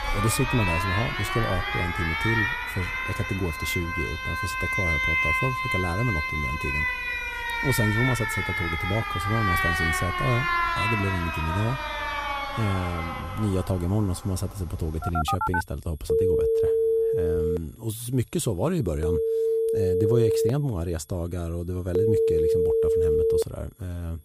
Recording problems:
alarms or sirens; very loud; throughout; 4 dB above the speech
high-pitched whine; faint; throughout; 11.5 kHz, 25 dB below the speech

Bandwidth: 15 kHz